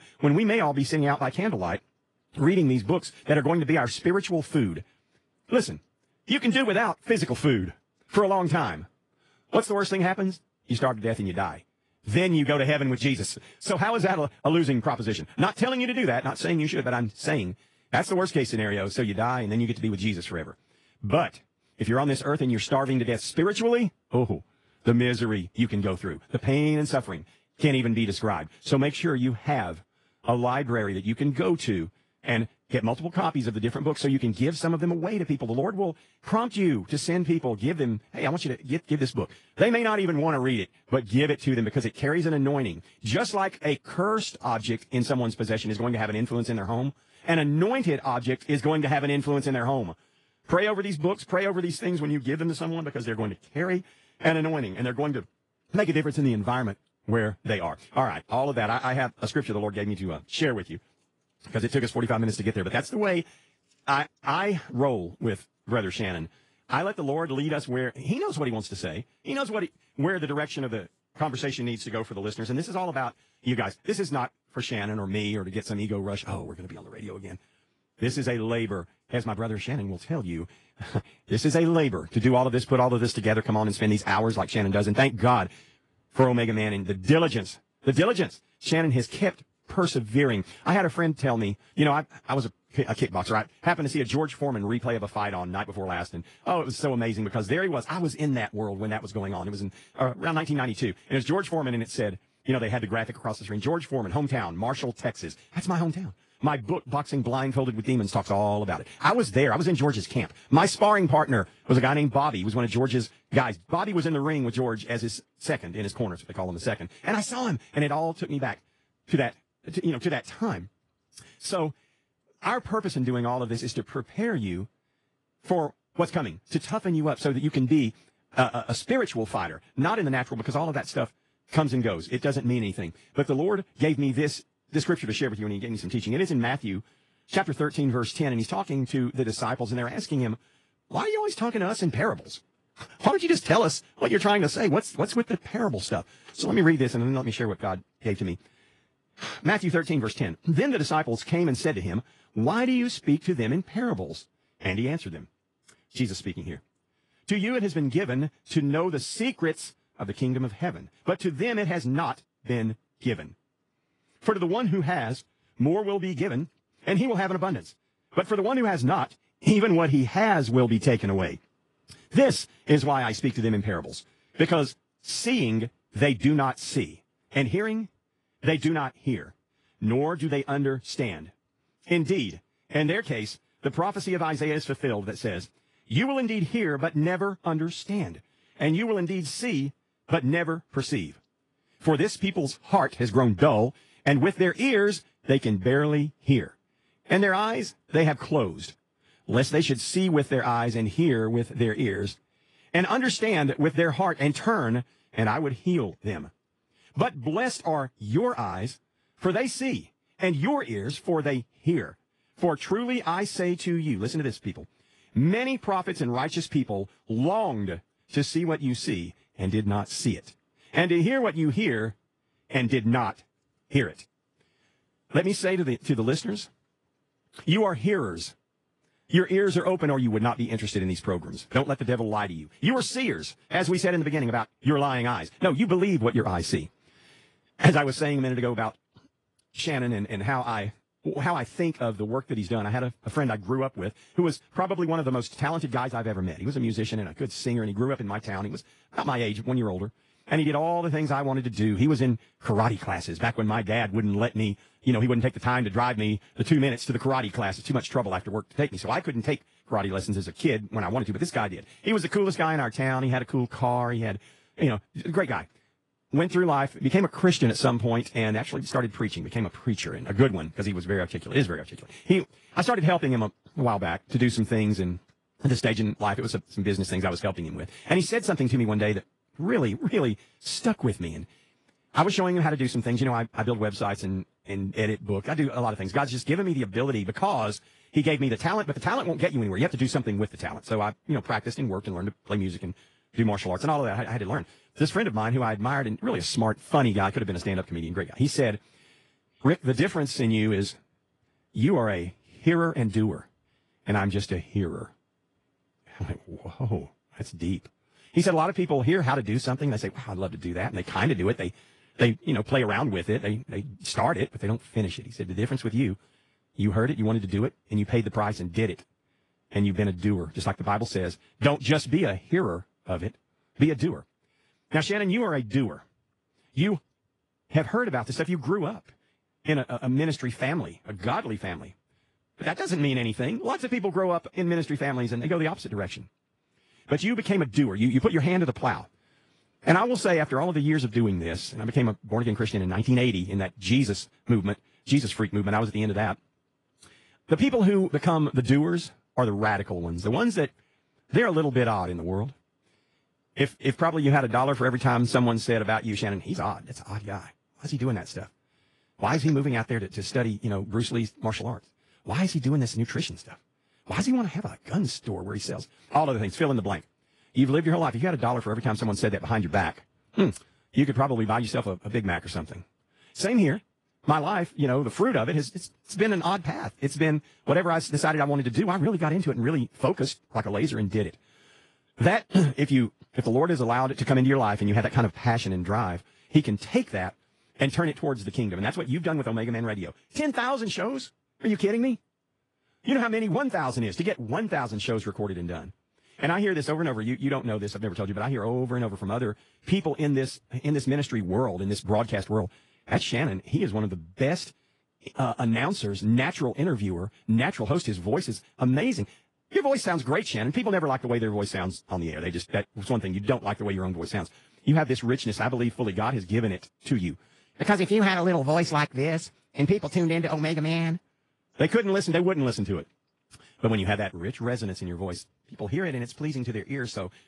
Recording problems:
wrong speed, natural pitch; too fast; 1.5 times normal speed
garbled, watery; slightly; nothing above 10.5 kHz

